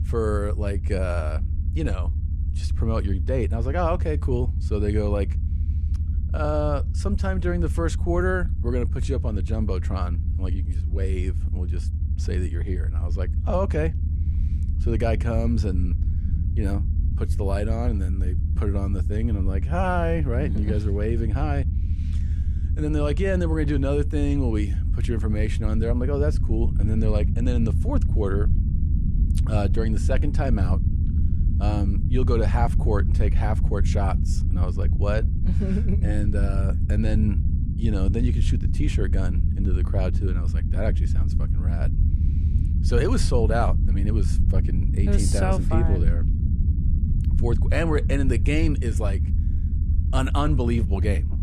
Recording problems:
low rumble; noticeable; throughout; 10 dB below the speech

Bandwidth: 14.5 kHz